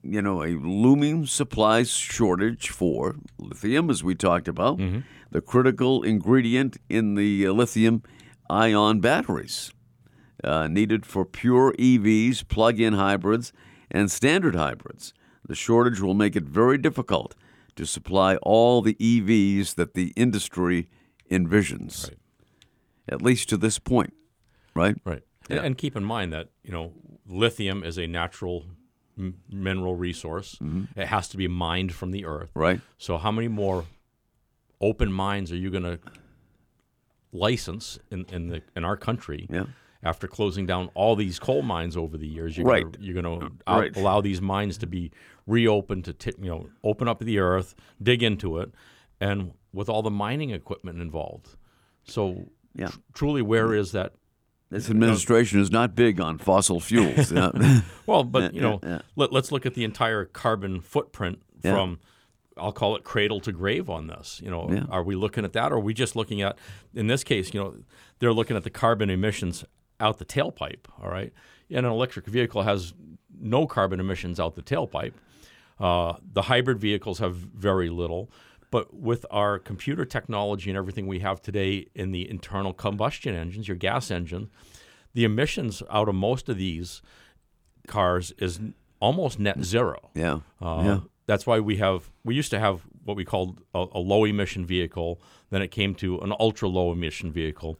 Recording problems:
none

